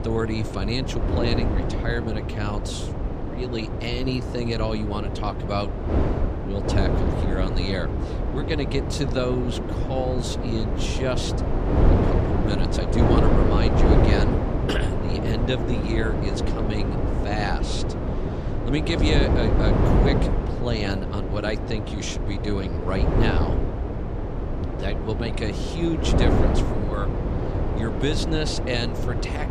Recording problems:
wind noise on the microphone; heavy; as loud as the speech

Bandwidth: 14.5 kHz